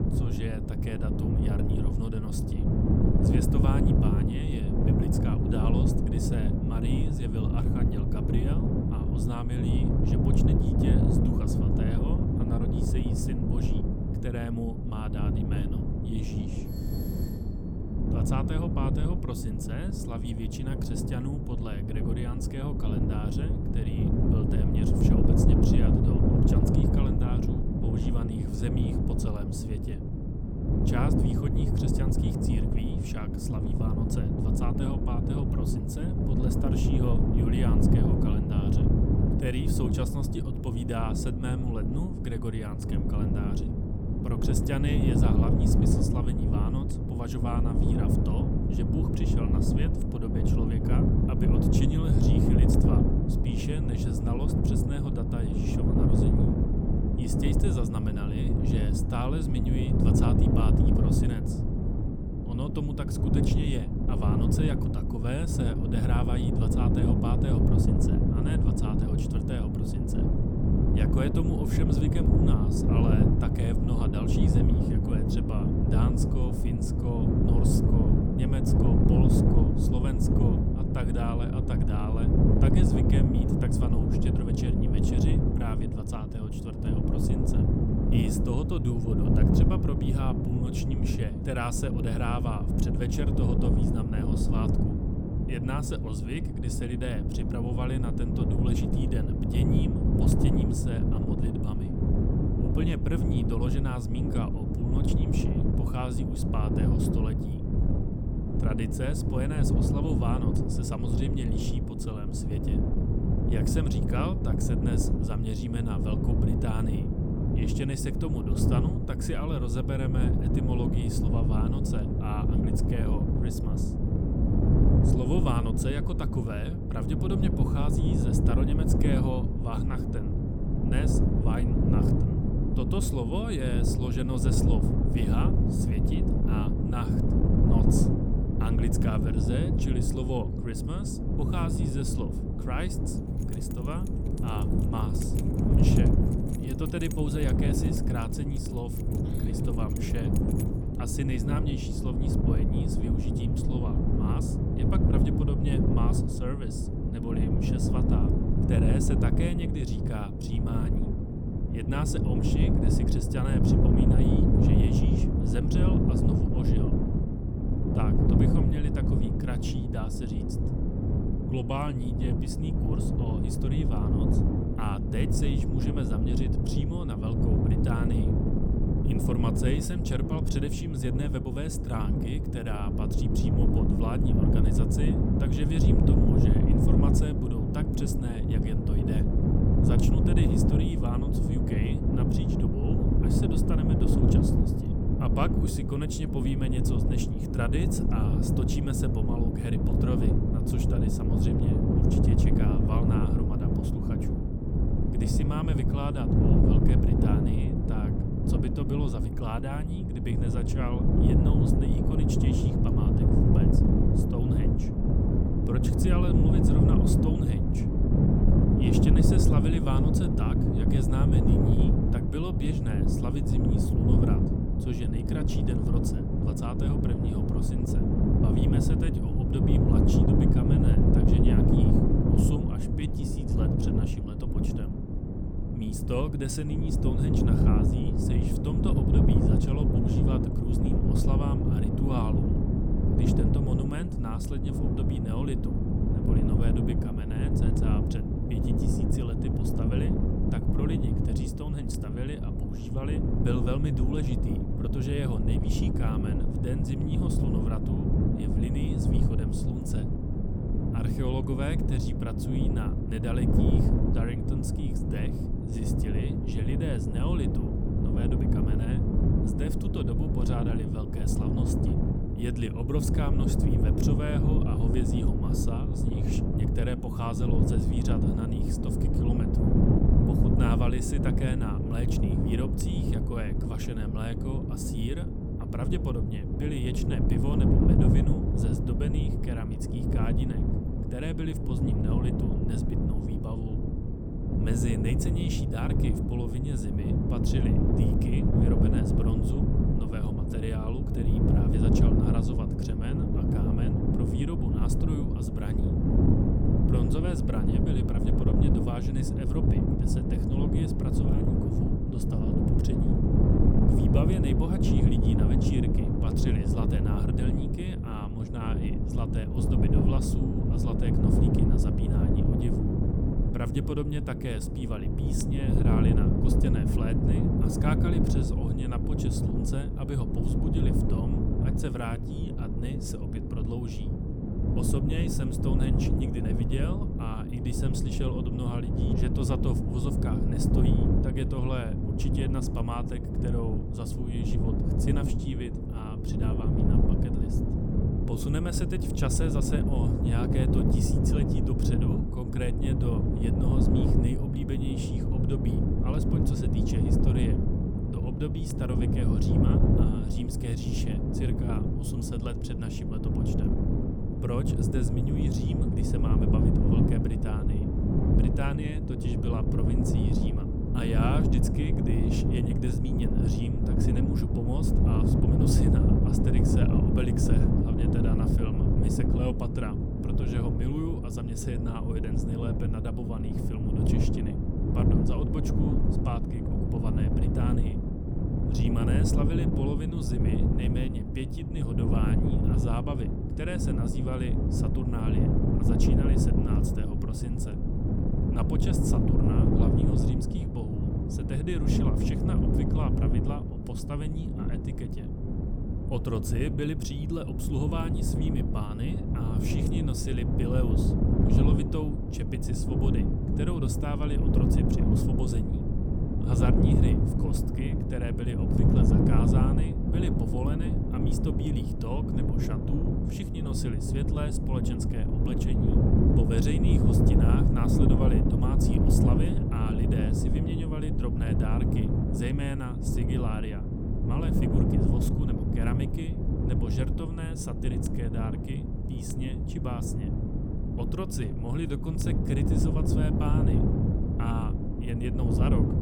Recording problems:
wind noise on the microphone; heavy; 4 dB above the speech
electrical hum; noticeable; from 1:50 to 3:27 and from 4:26 to 6:23; 50 Hz, 10 dB below the speech
doorbell; faint; at 17 s; peak 10 dB below the speech
jangling keys; noticeable; from 2:23 to 2:31; peak 9 dB below the speech

